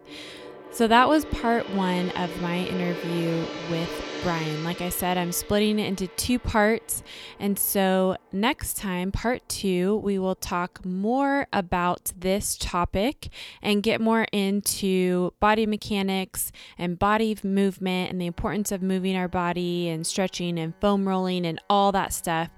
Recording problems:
background music; noticeable; throughout; 10 dB below the speech

